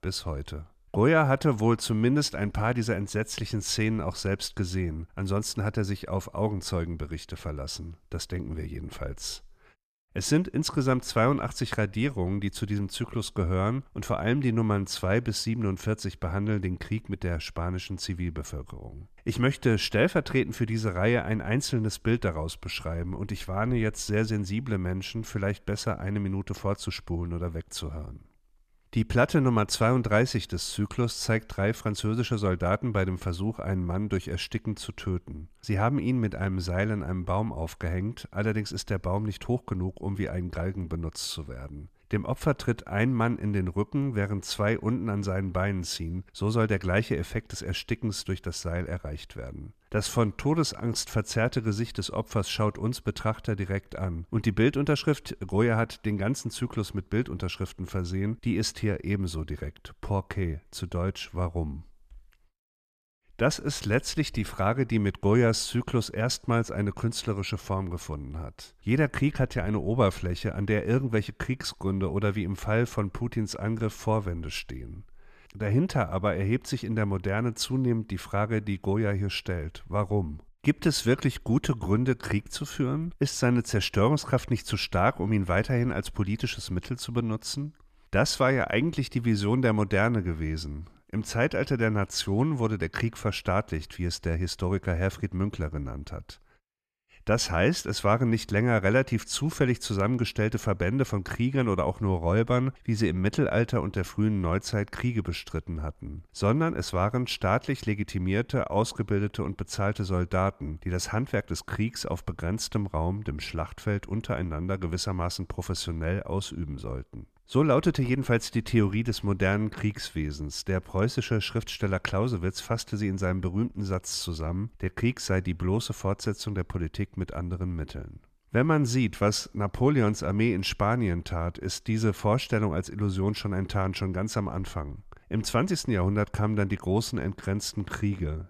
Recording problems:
none

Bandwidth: 14.5 kHz